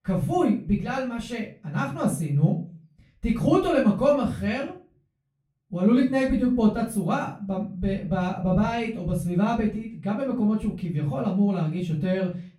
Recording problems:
off-mic speech; far
room echo; slight; dies away in 0.3 s

